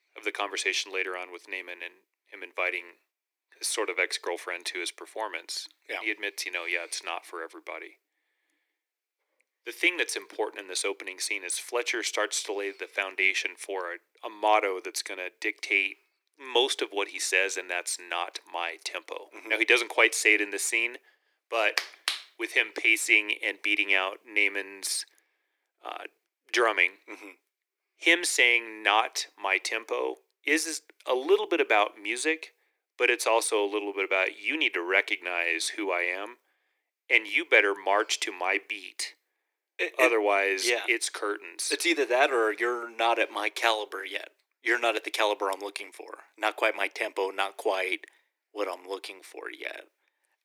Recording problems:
thin; very; fading below 300 Hz

